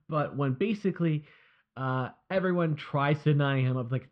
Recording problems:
muffled; very; fading above 3 kHz

